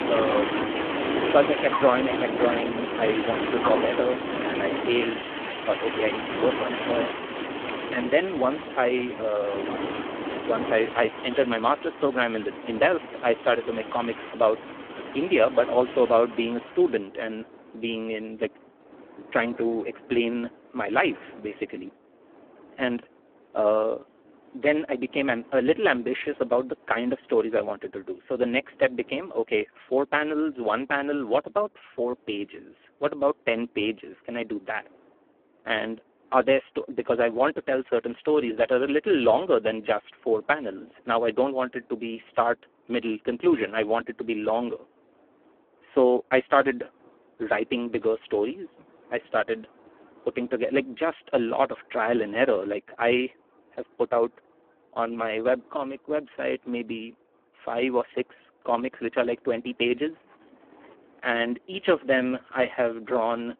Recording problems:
phone-call audio; poor line
wind in the background; loud; throughout; 5 dB below the speech

